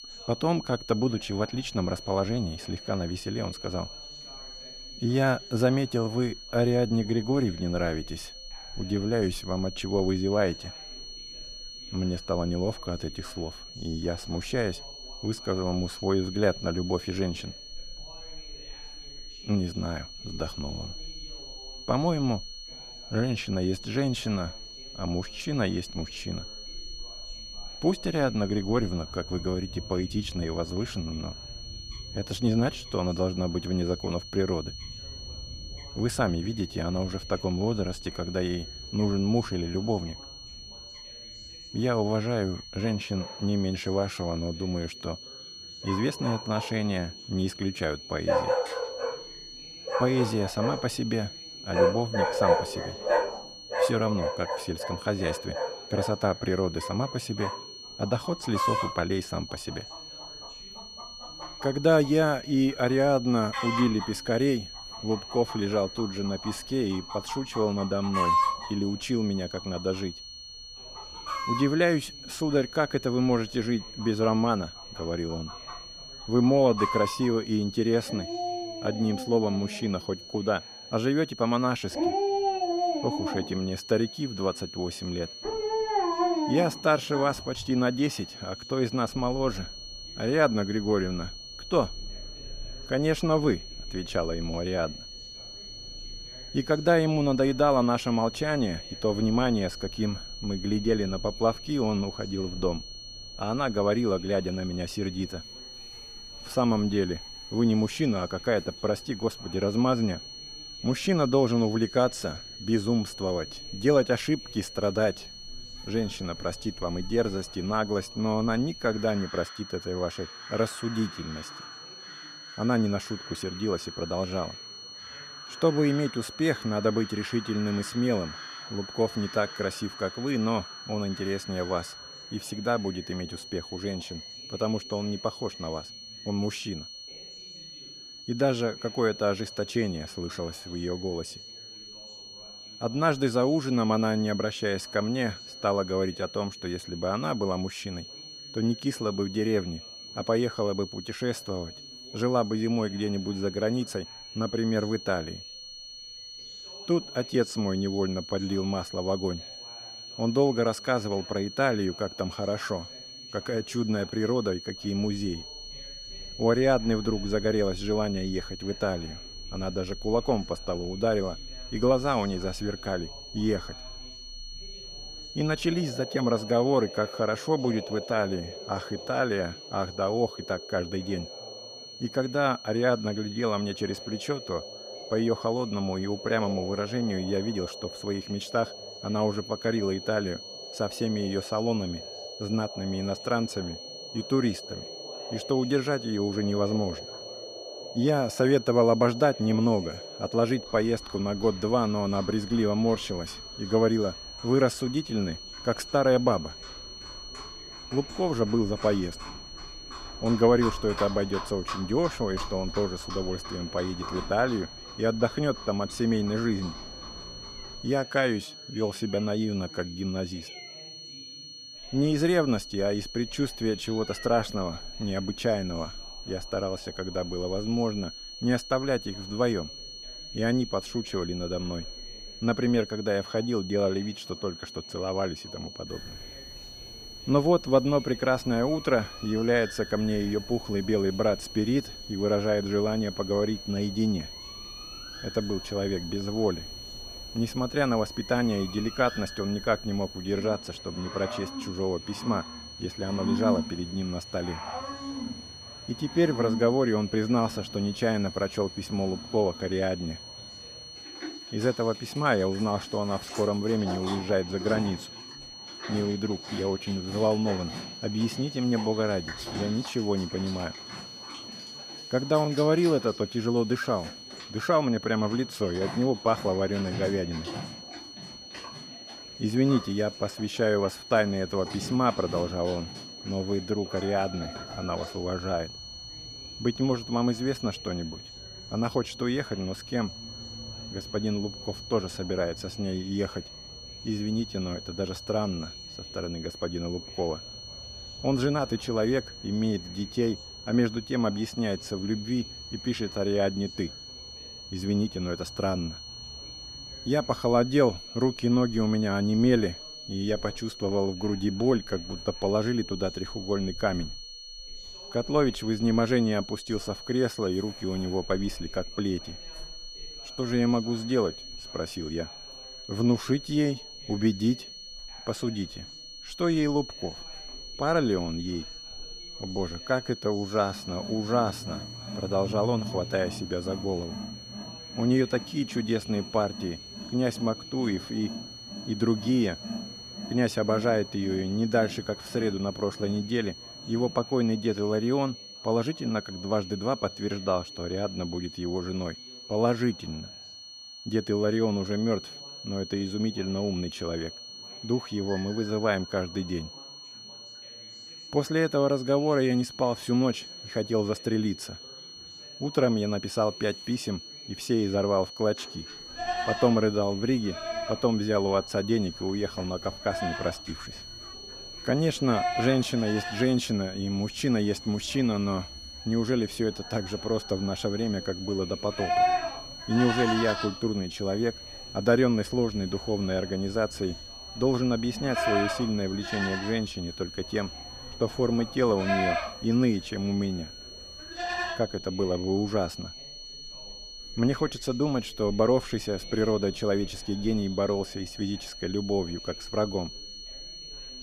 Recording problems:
animal sounds; loud; throughout; 9 dB below the speech
high-pitched whine; noticeable; throughout; 4.5 kHz, 10 dB below the speech
background chatter; faint; throughout; 3 voices, 25 dB below the speech

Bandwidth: 15 kHz